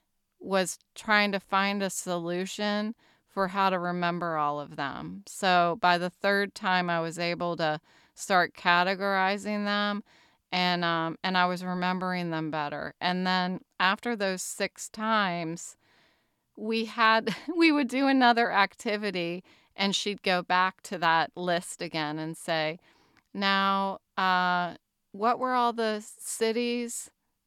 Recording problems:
none

